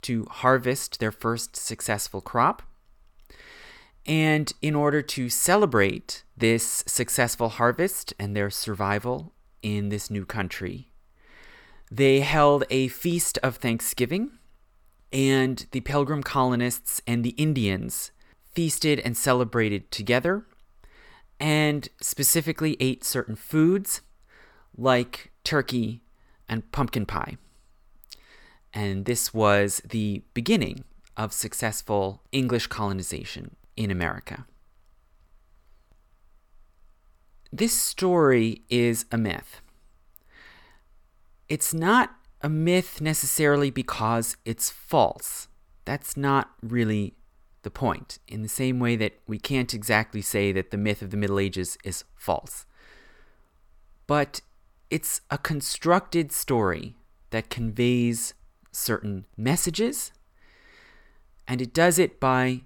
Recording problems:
none

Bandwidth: 18 kHz